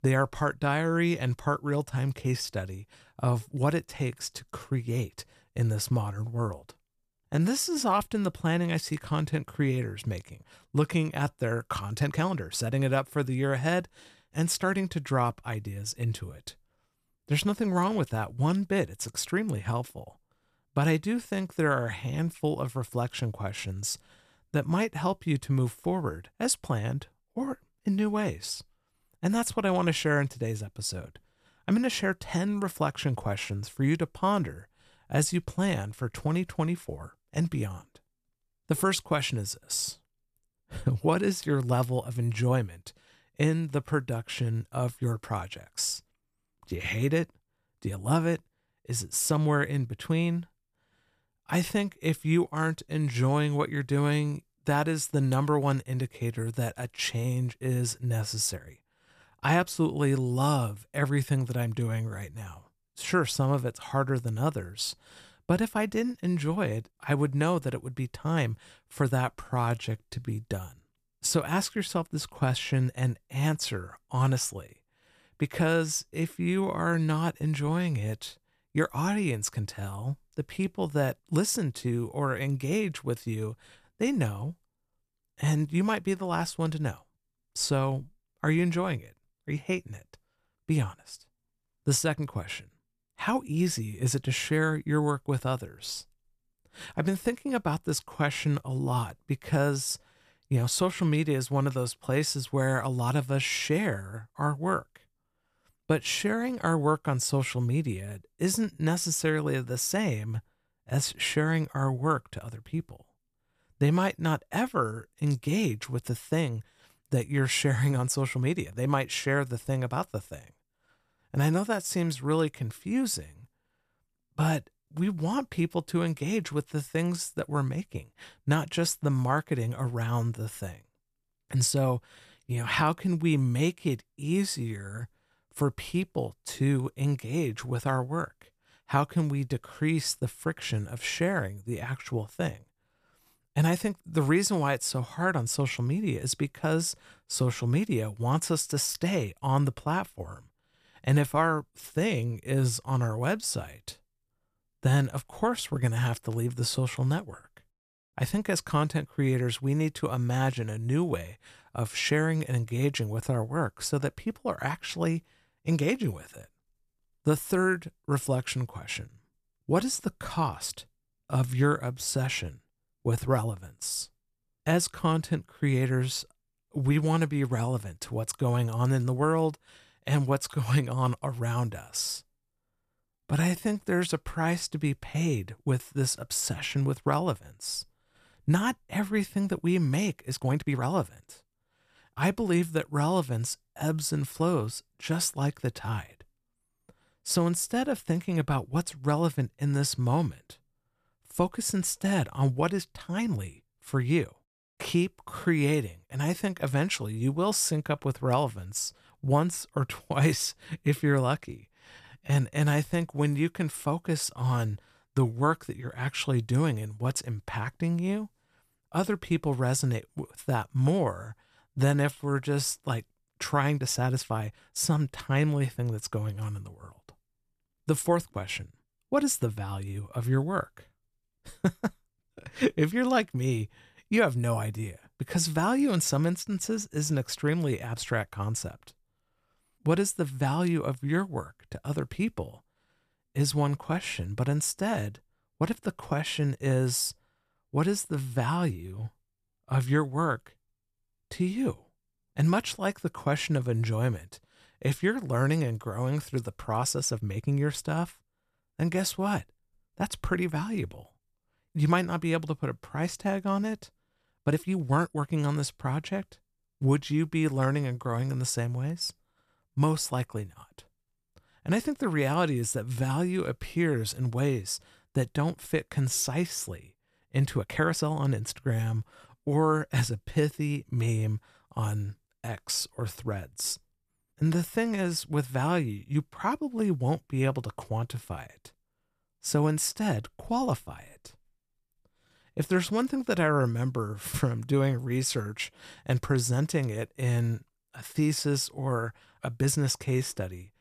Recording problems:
uneven, jittery; strongly; from 7 s to 4:47

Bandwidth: 14.5 kHz